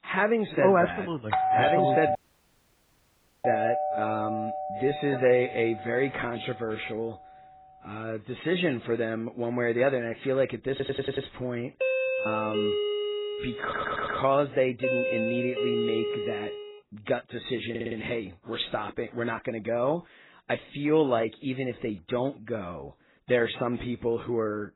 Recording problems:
garbled, watery; badly; nothing above 4 kHz
doorbell; loud; from 1.5 to 5.5 s and from 12 to 17 s; peak 5 dB above the speech
audio cutting out; at 2 s for 1.5 s
audio stuttering; at 11 s, at 14 s and at 18 s

